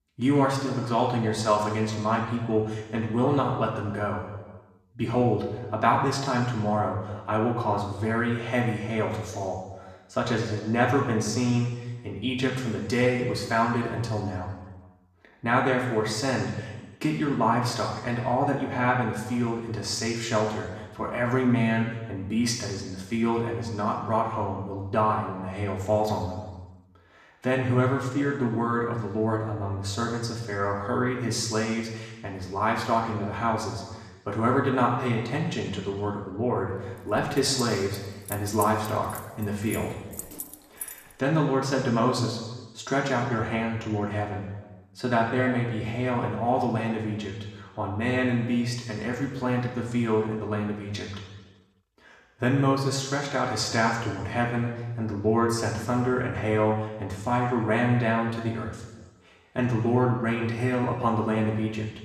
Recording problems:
off-mic speech; far
room echo; noticeable; dies away in 1.2 s
jangling keys; noticeable; from 37 to 41 s; peak 8 dB below the speech

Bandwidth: 14.5 kHz